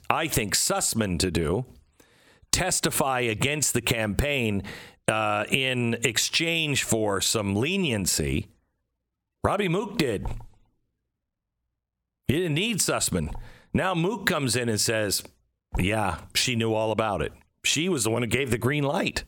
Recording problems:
squashed, flat; somewhat

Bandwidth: 18 kHz